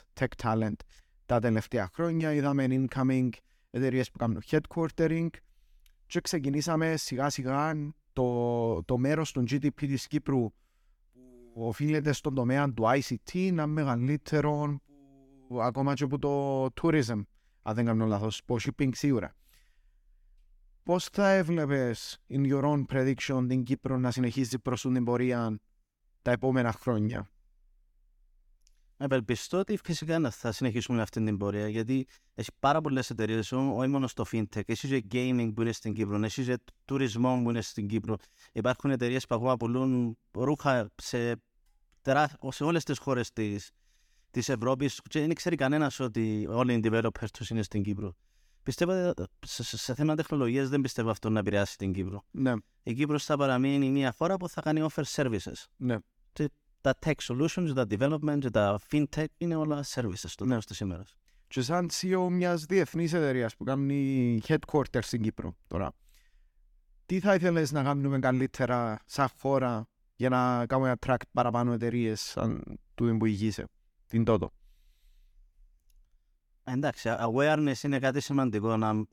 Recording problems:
none

